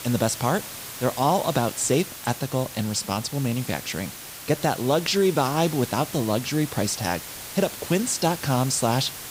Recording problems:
hiss; noticeable; throughout; 10 dB below the speech

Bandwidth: 15.5 kHz